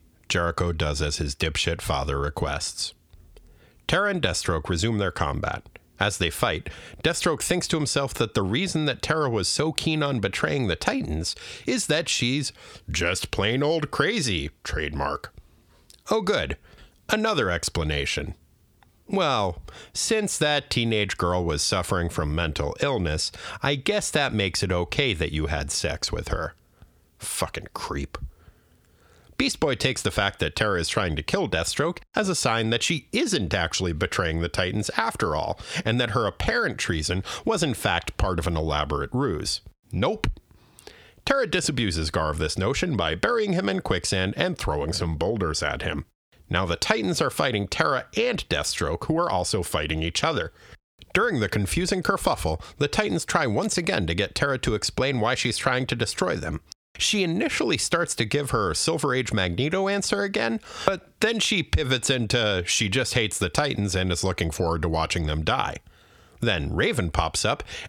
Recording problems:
squashed, flat; heavily

